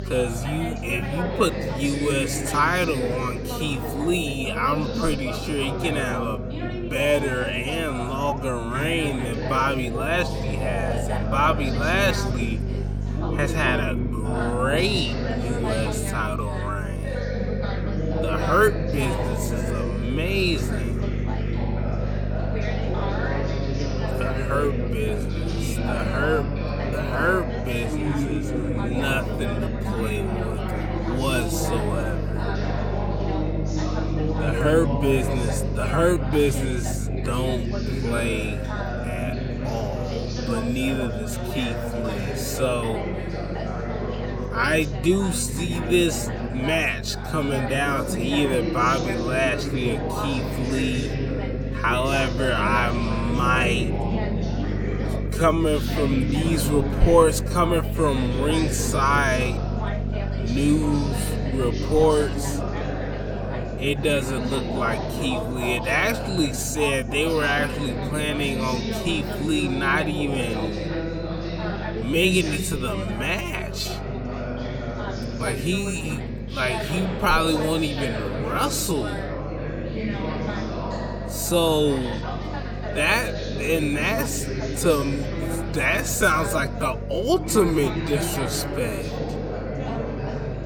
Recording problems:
wrong speed, natural pitch; too slow; 0.5 times normal speed
background chatter; loud; throughout; 3 voices, 5 dB below the speech
electrical hum; noticeable; throughout; 50 Hz, 20 dB below the speech

